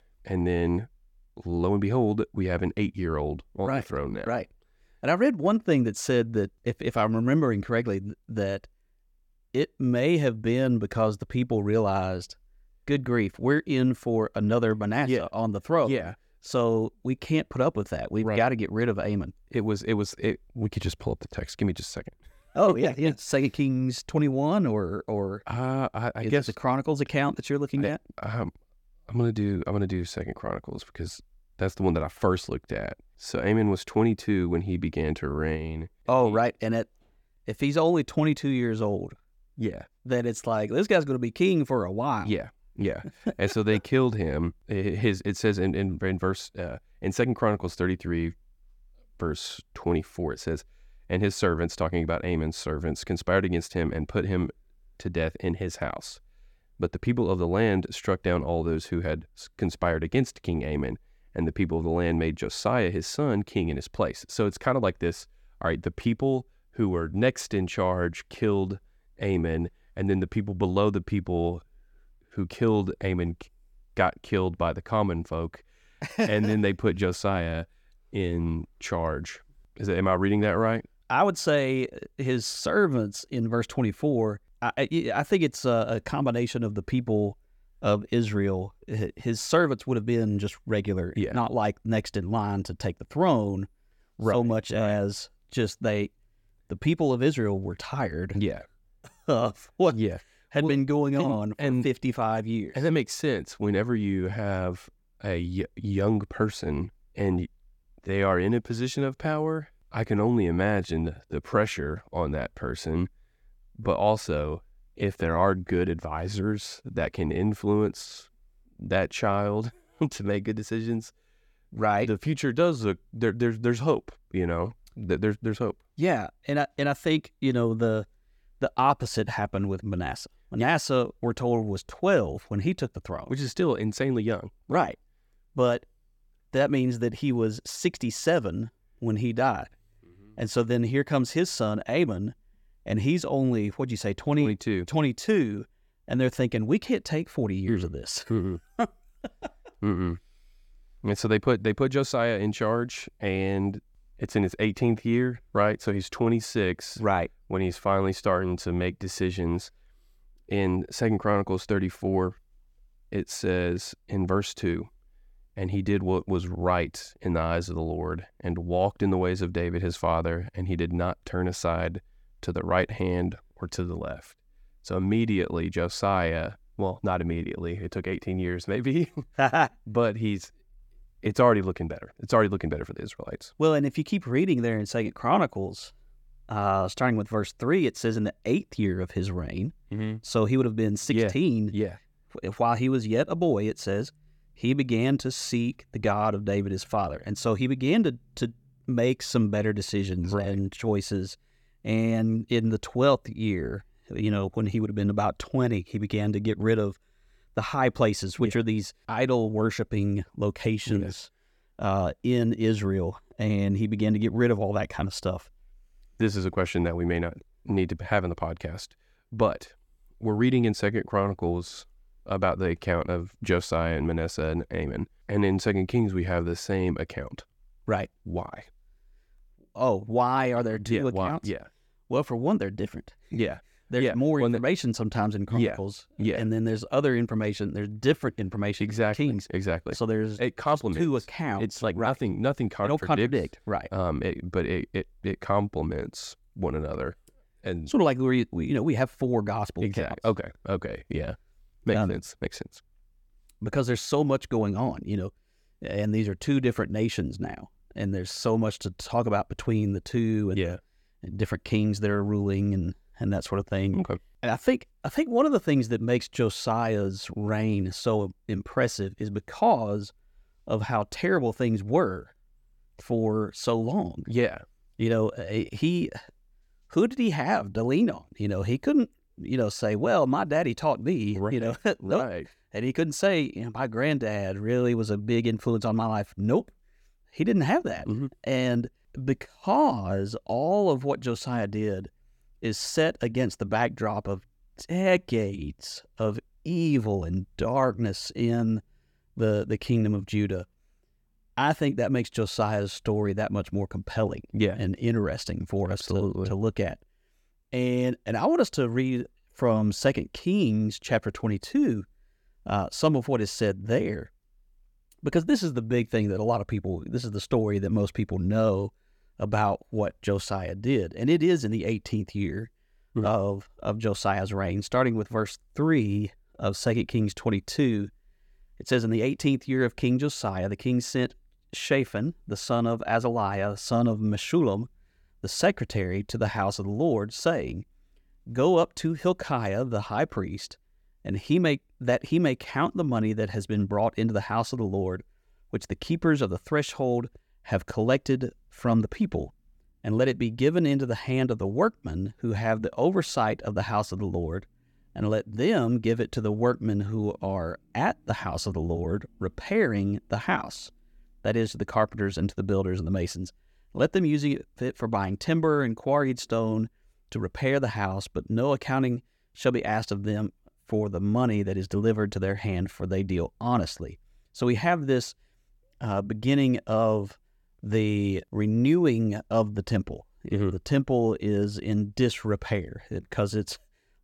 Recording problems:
none

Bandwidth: 17.5 kHz